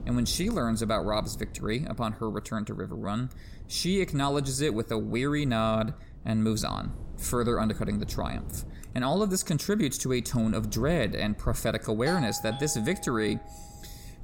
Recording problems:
wind noise on the microphone; occasional gusts; 25 dB below the speech
doorbell; noticeable; from 12 to 13 s; peak 7 dB below the speech

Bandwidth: 17 kHz